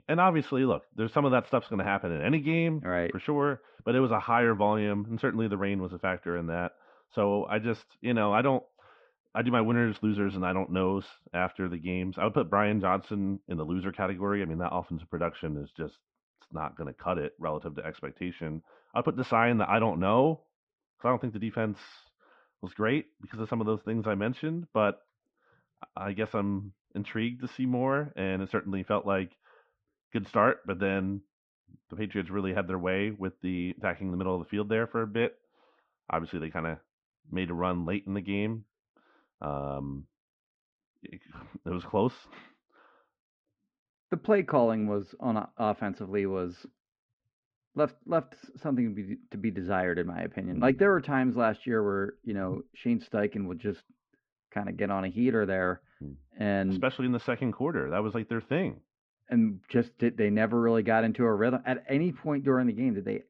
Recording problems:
muffled; very; fading above 2.5 kHz

